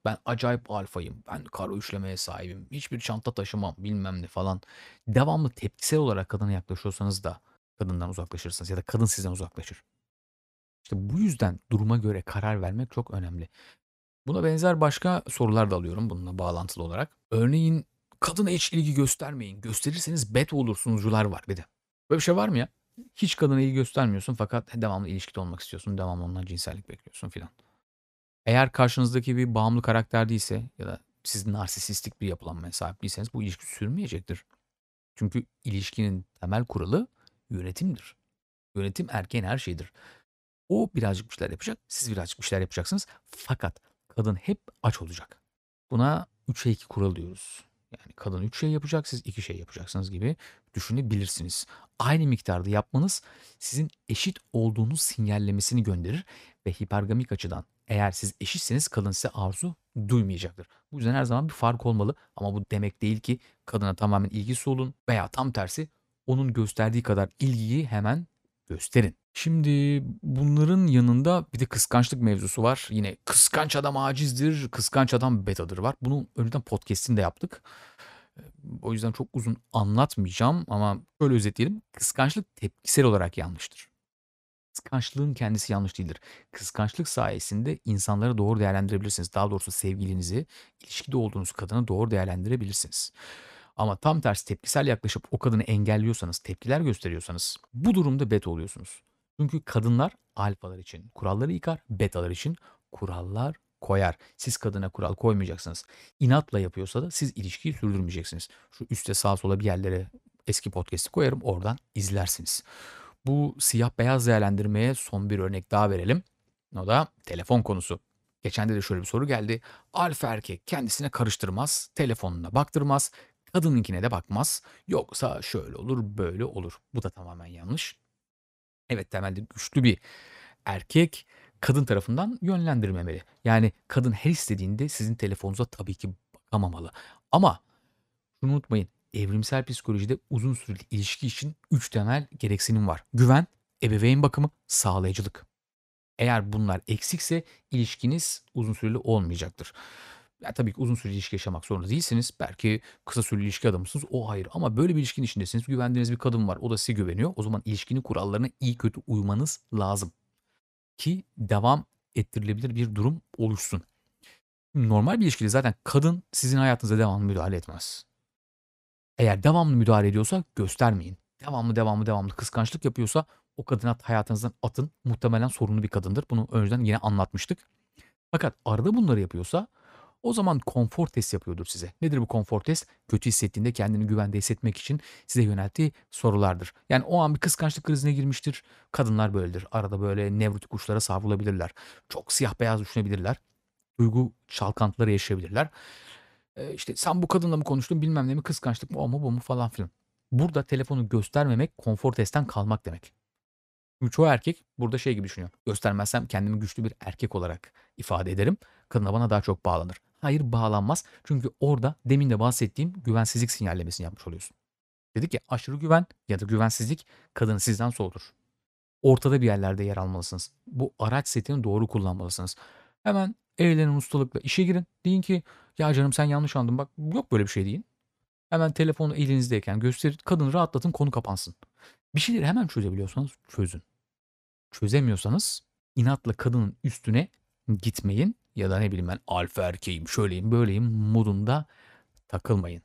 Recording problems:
none

